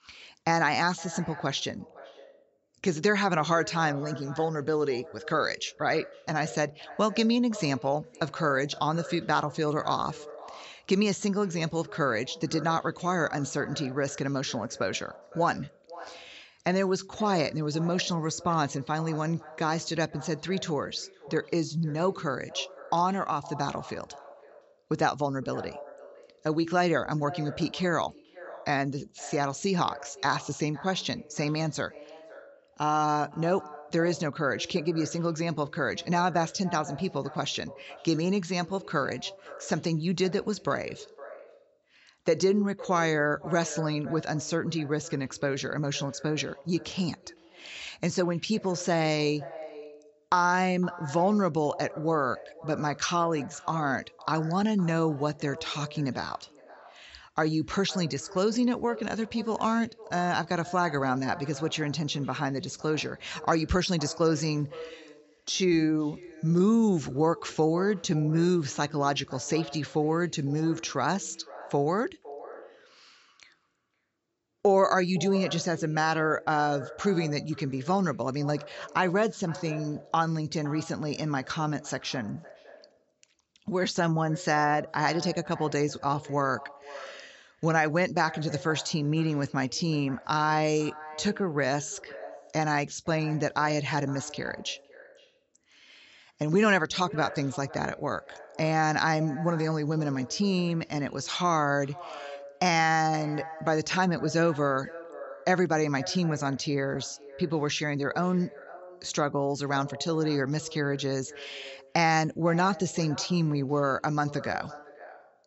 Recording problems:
echo of what is said; noticeable; throughout; 510 ms later, 15 dB below the speech
high frequencies cut off; noticeable; nothing above 7.5 kHz

